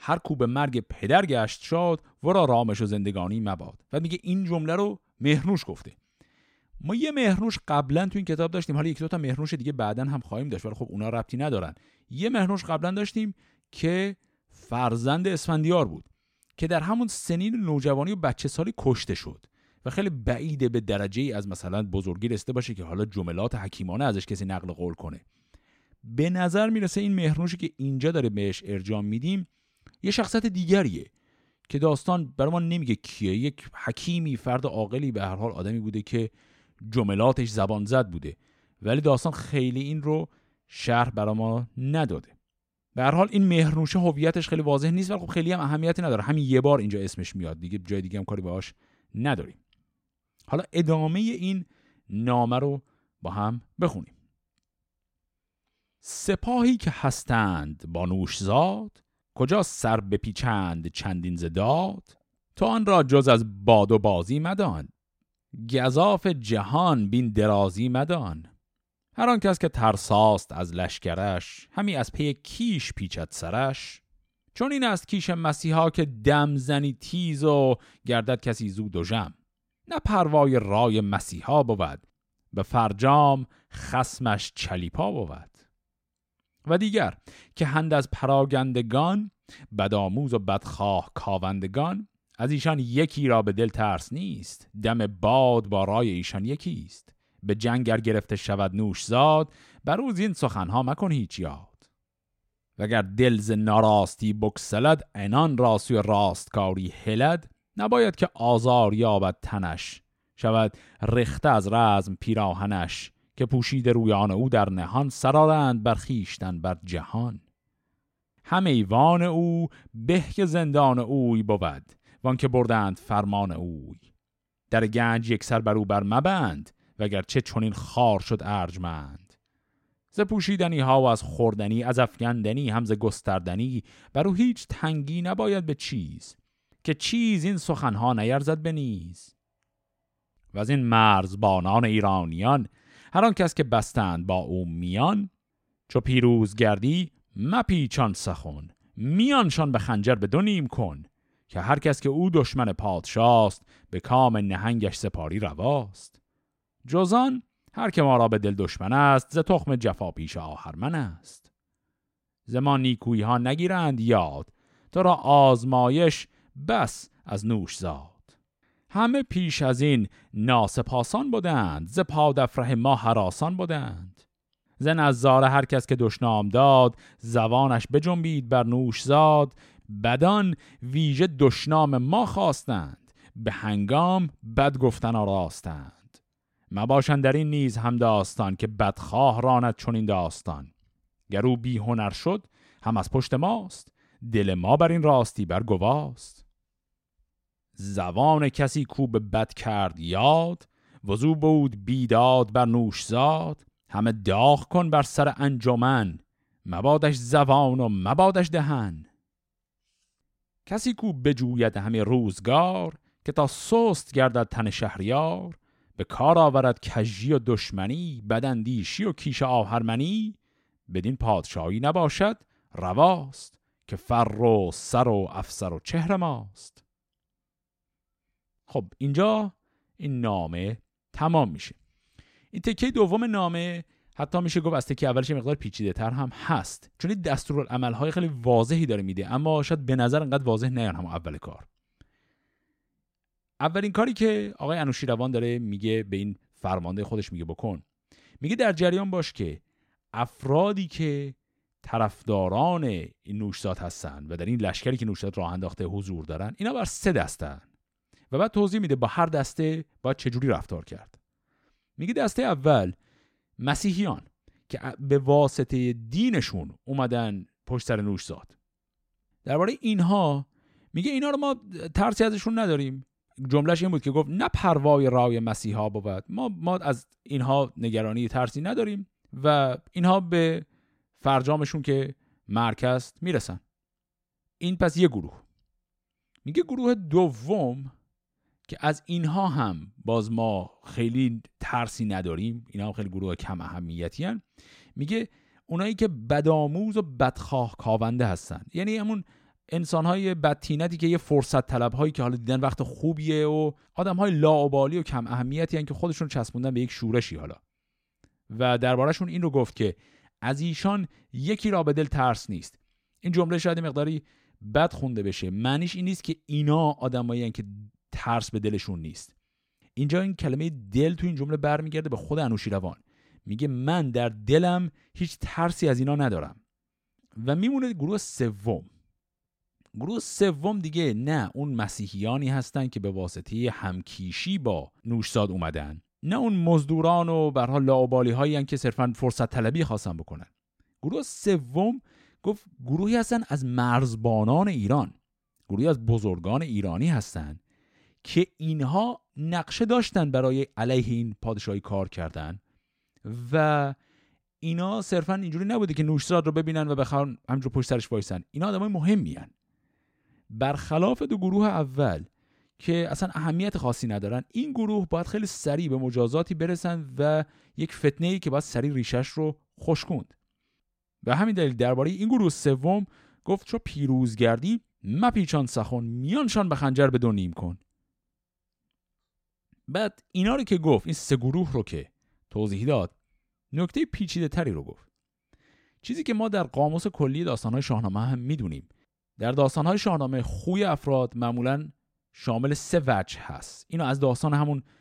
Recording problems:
none

